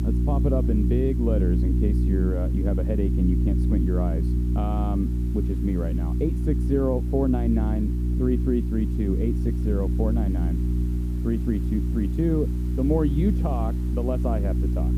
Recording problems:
muffled; very; fading above 1 kHz
electrical hum; loud; throughout; 60 Hz, 6 dB below the speech
hiss; faint; throughout; 25 dB below the speech

